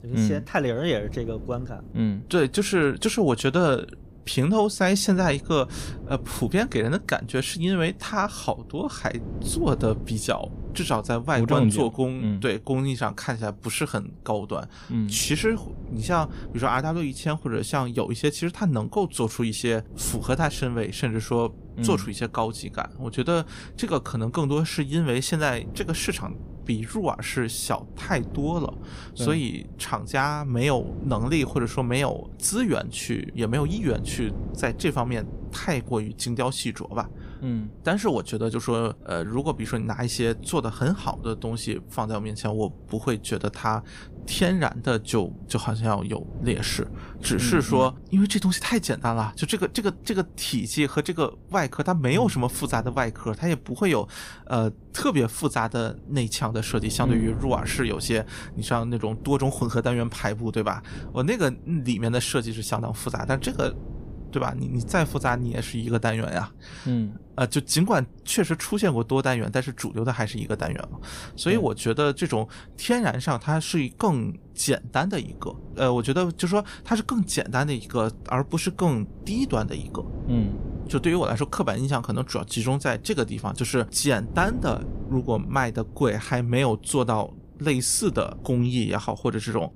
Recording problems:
wind noise on the microphone; occasional gusts; 20 dB below the speech

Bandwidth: 15 kHz